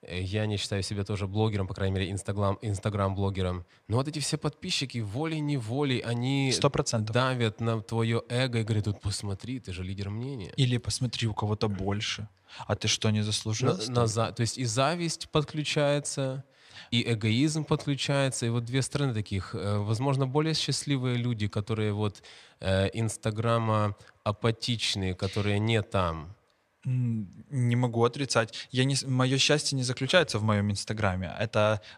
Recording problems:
none

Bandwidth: 14 kHz